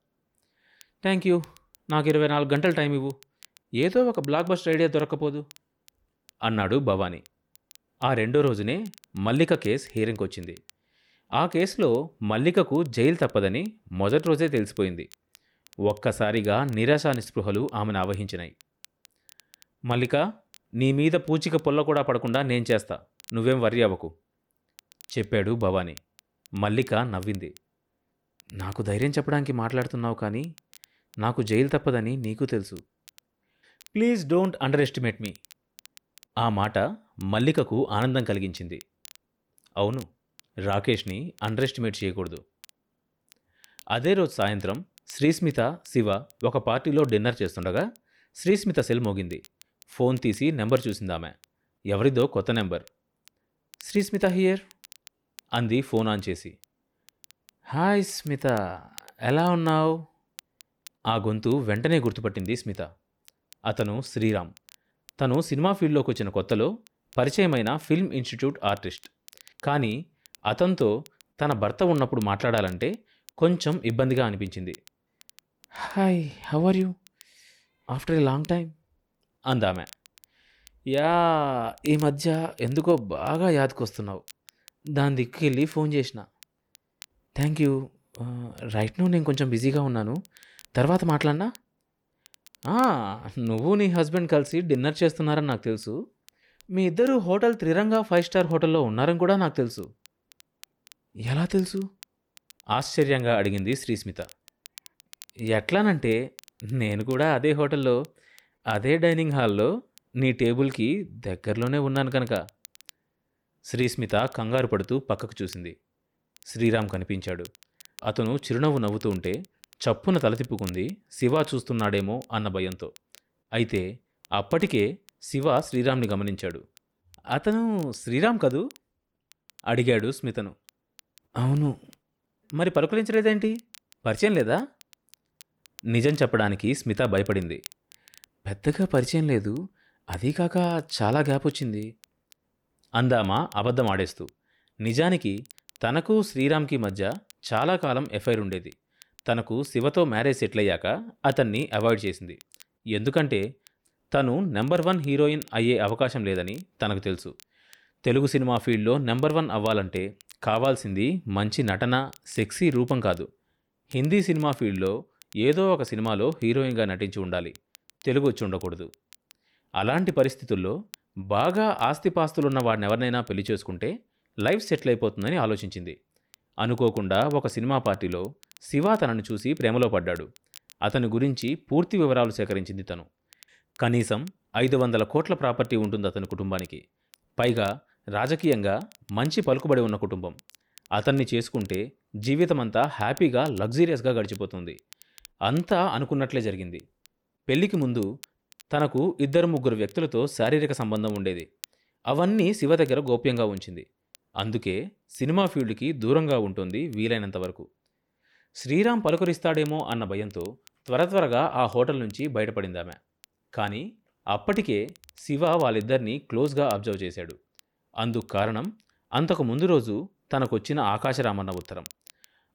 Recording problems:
crackle, like an old record; faint; 25 dB below the speech

